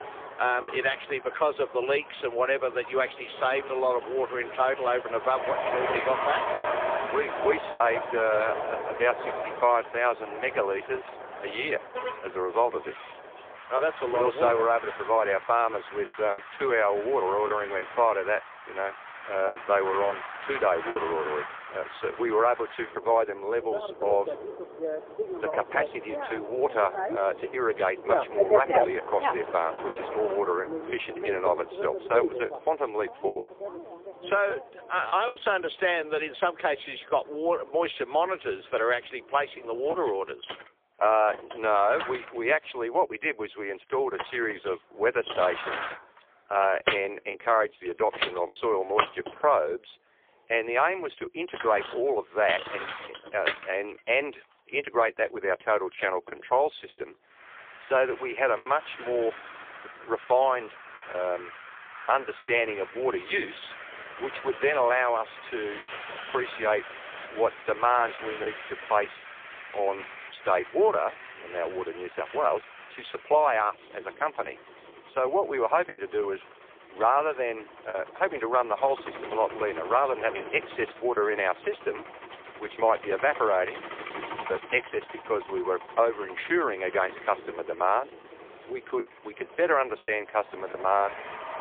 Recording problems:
phone-call audio; poor line
traffic noise; loud; throughout; 8 dB below the speech
choppy; occasionally; 2% of the speech affected

